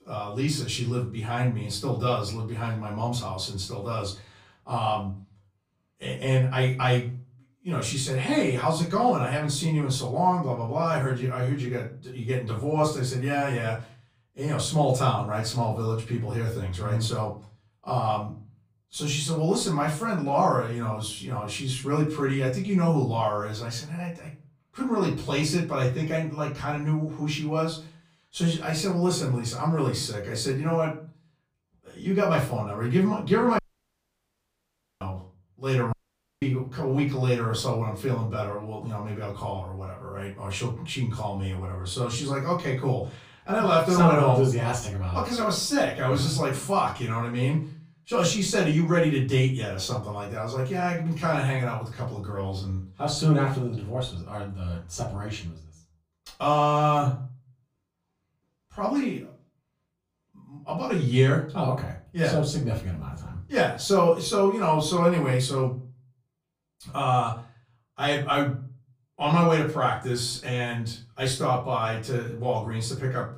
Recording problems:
off-mic speech; far
room echo; slight; dies away in 0.3 s
audio cutting out; at 34 s for 1.5 s and at 36 s

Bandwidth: 15 kHz